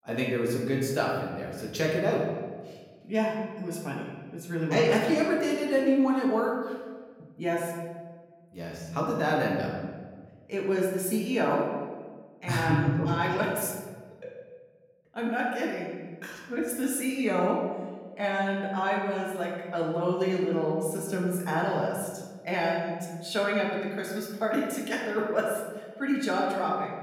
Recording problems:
off-mic speech; far
room echo; noticeable; dies away in 1.3 s

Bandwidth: 16.5 kHz